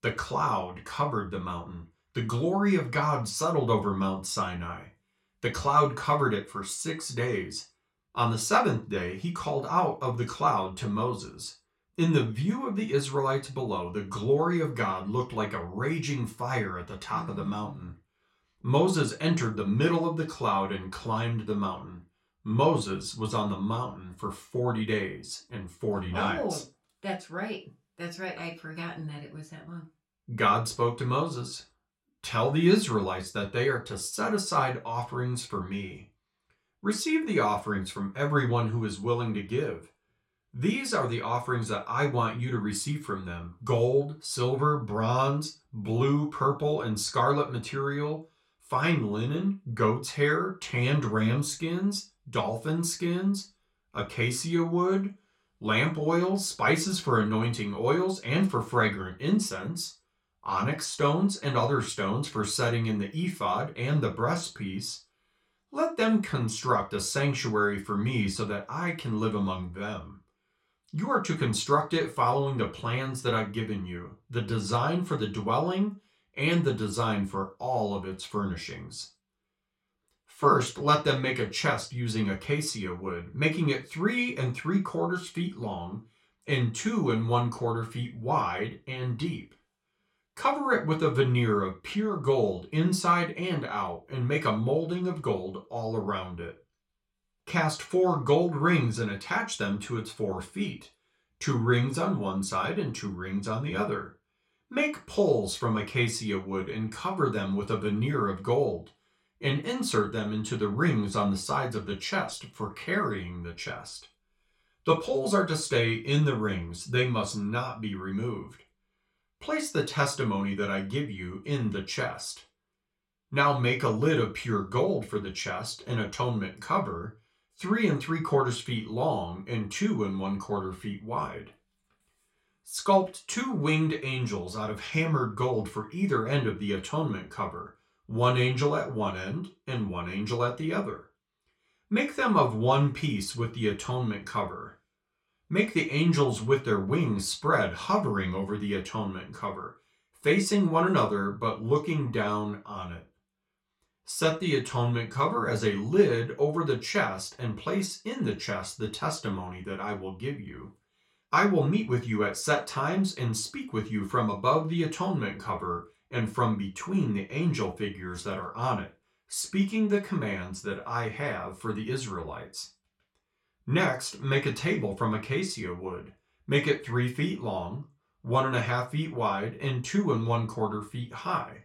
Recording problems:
off-mic speech; far
room echo; very slight; dies away in 0.3 s

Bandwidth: 16 kHz